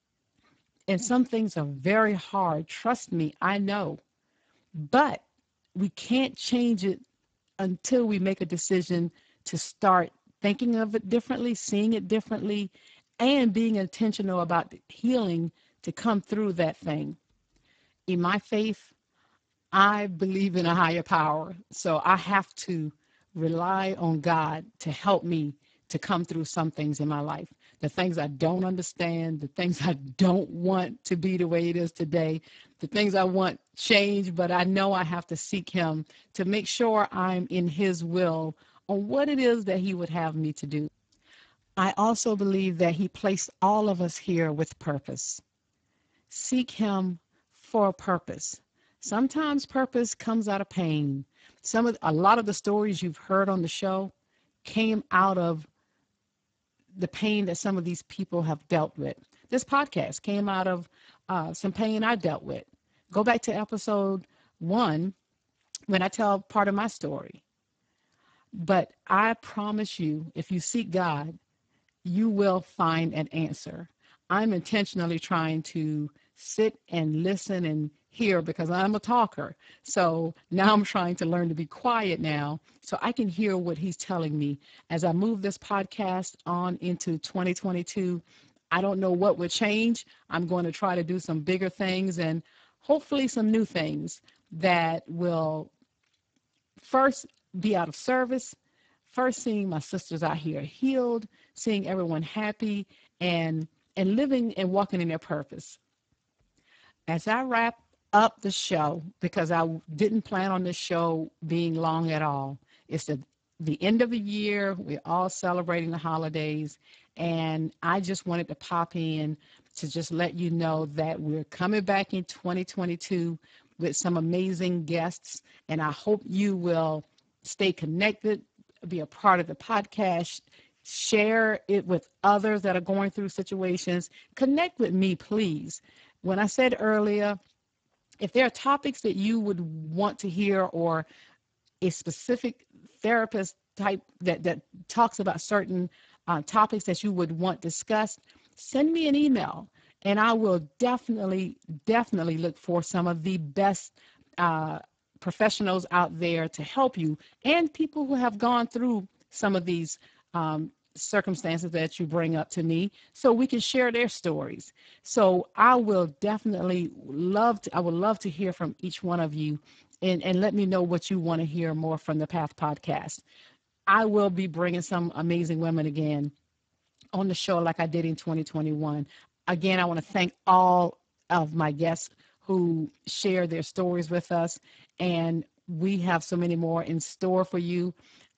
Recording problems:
garbled, watery; badly; nothing above 7.5 kHz

